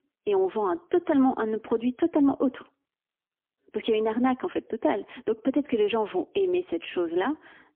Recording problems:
phone-call audio; poor line; nothing above 3.5 kHz

